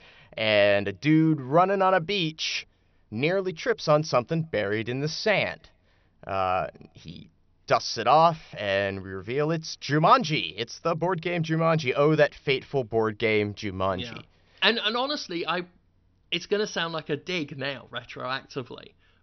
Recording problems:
high frequencies cut off; noticeable; nothing above 6 kHz

